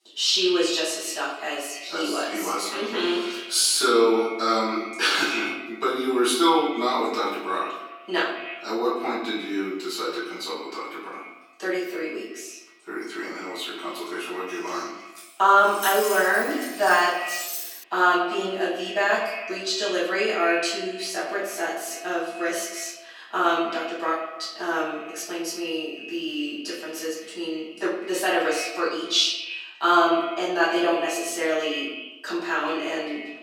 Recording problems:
echo of what is said; strong; throughout; 90 ms later, 10 dB below the speech
off-mic speech; far
room echo; noticeable; dies away in 0.7 s
thin; somewhat; fading below 300 Hz
jangling keys; noticeable; from 15 to 18 s; peak 3 dB below the speech

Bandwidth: 16.5 kHz